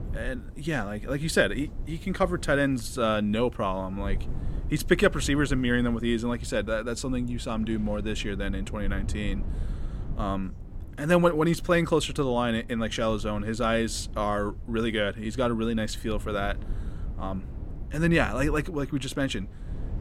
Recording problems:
low rumble; faint; throughout; 20 dB below the speech

